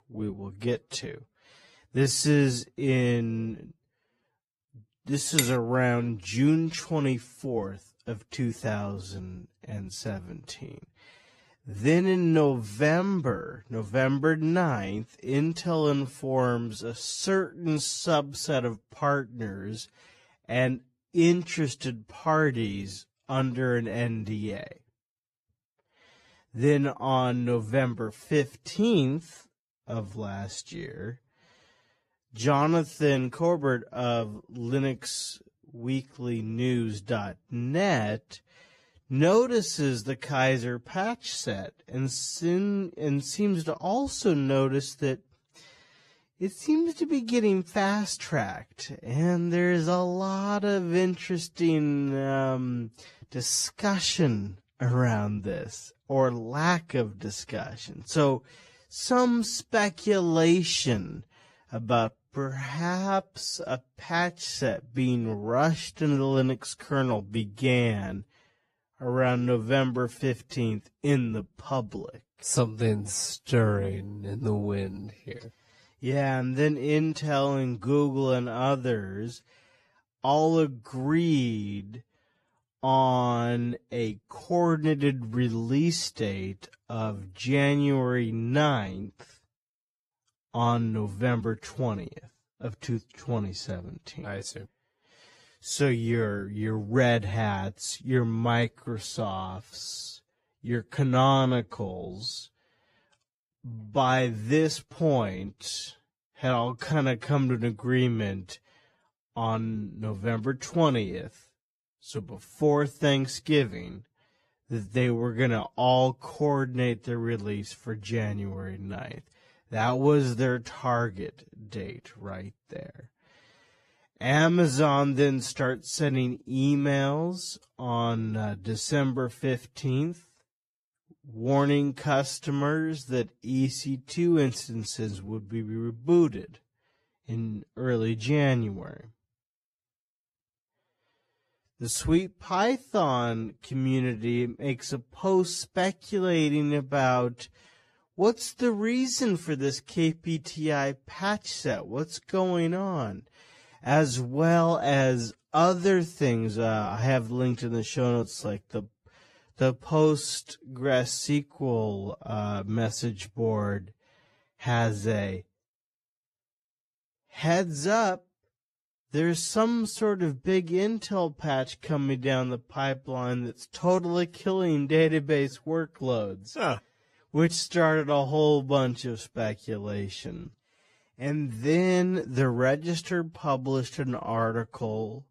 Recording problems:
wrong speed, natural pitch; too slow; 0.6 times normal speed
garbled, watery; slightly
clattering dishes; loud; at 5.5 s; peak level with the speech

